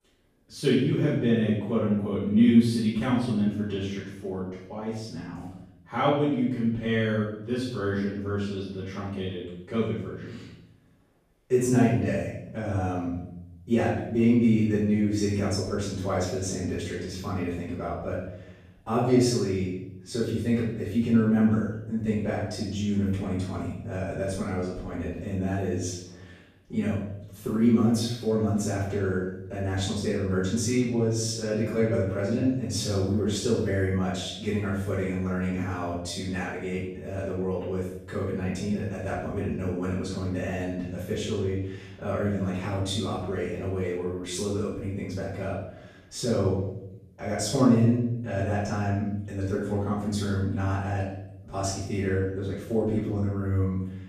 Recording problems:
off-mic speech; far
room echo; noticeable; dies away in 0.8 s

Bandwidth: 14.5 kHz